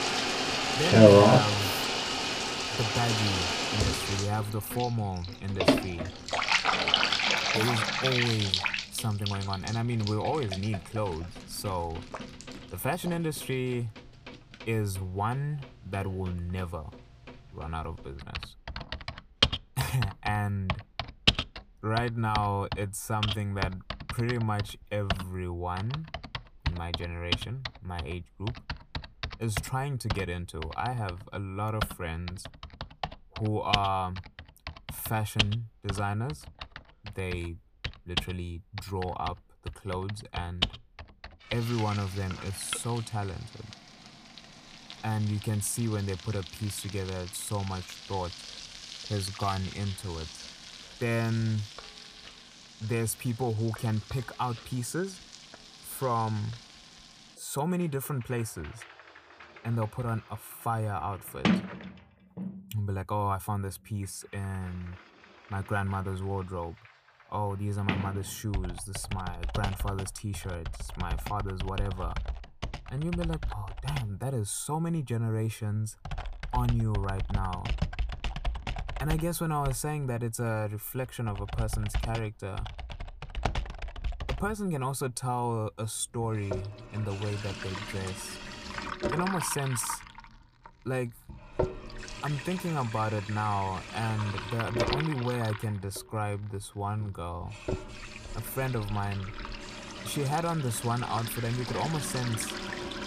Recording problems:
household noises; very loud; throughout; 1 dB above the speech

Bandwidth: 15 kHz